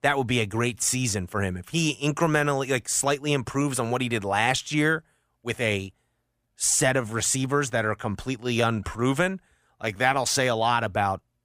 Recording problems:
uneven, jittery; strongly; from 0.5 to 10 s

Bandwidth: 15 kHz